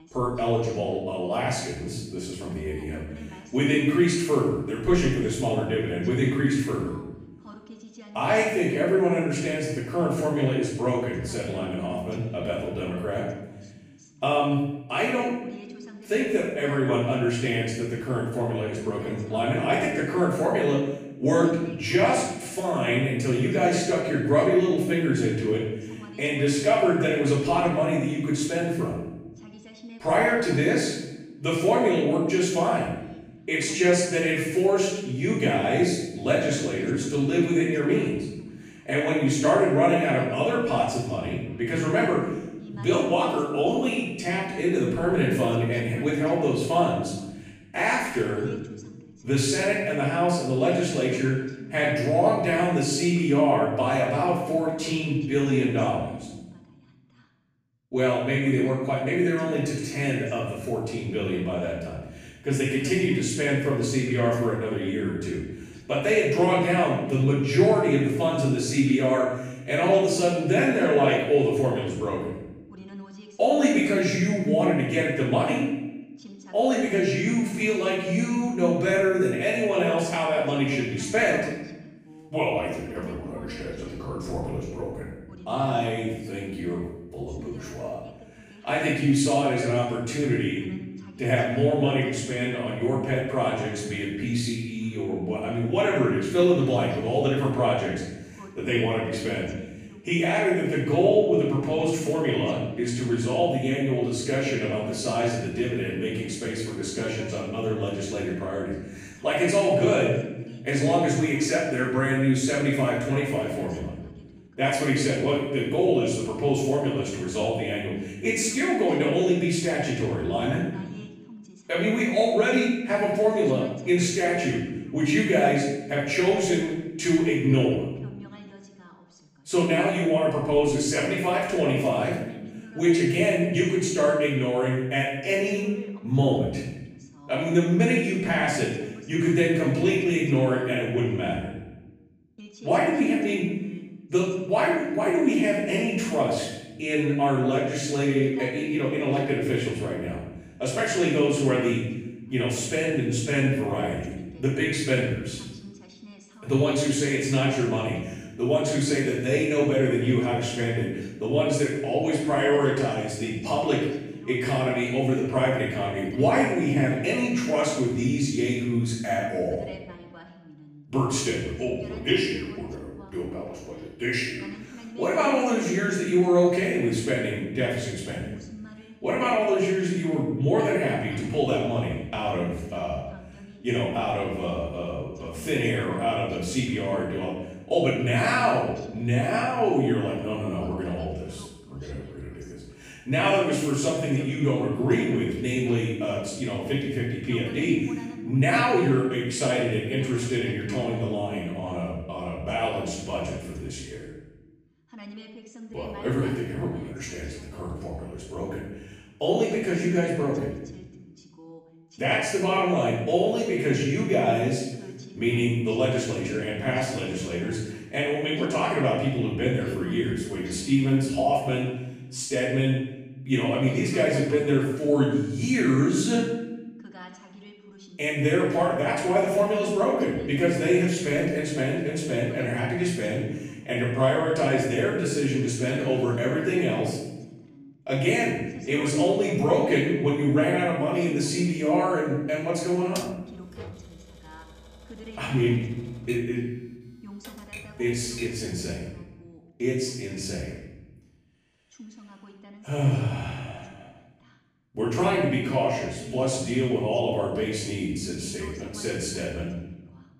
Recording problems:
off-mic speech; far
room echo; noticeable; dies away in 0.9 s
voice in the background; faint; throughout; 20 dB below the speech
keyboard typing; faint; from 4:03 to 4:08; peak 15 dB below the speech

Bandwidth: 15 kHz